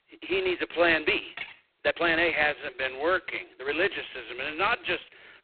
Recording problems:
phone-call audio; poor line; nothing above 4 kHz
thin; very; fading below 350 Hz
uneven, jittery; strongly; from 0.5 to 5 s
clattering dishes; faint; at 1.5 s; peak 10 dB below the speech

